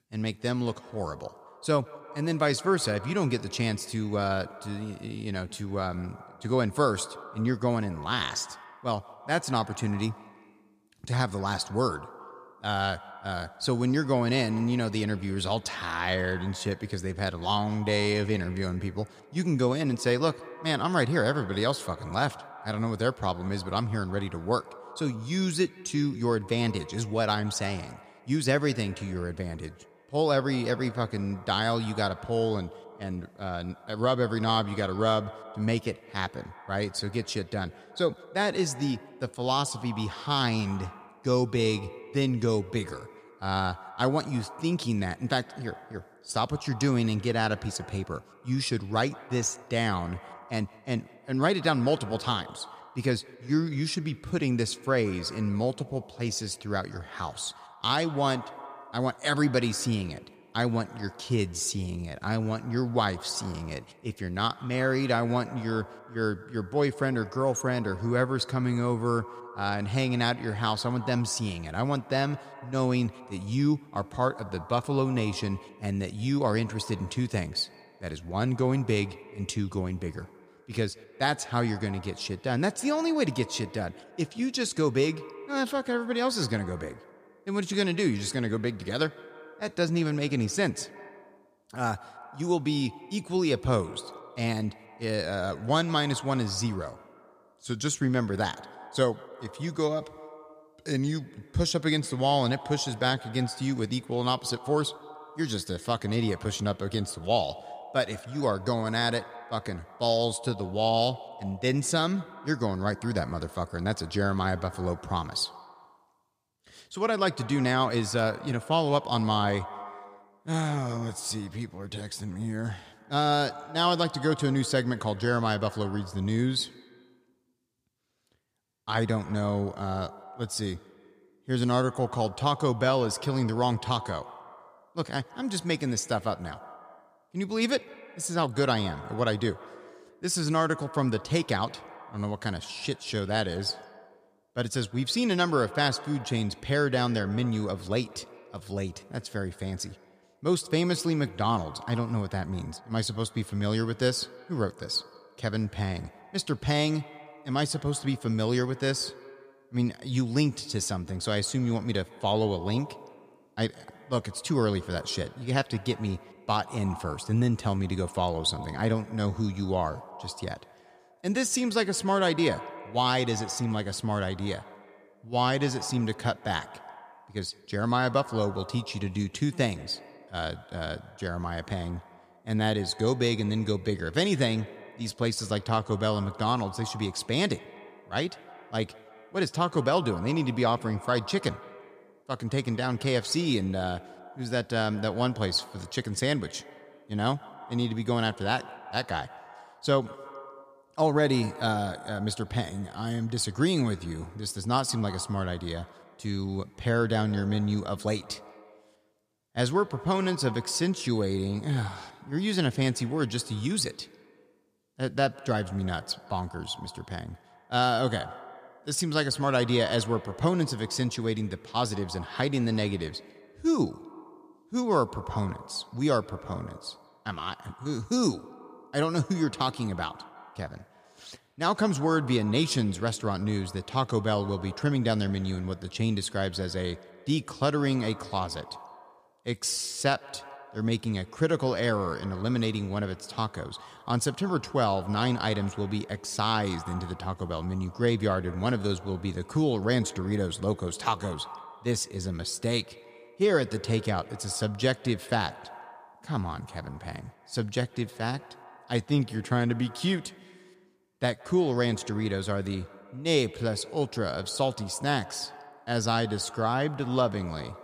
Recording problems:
echo of what is said; noticeable; throughout; 160 ms later, 20 dB below the speech

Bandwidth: 14.5 kHz